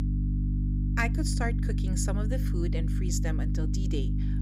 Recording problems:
electrical hum; loud; throughout; 50 Hz, 5 dB below the speech

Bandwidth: 15.5 kHz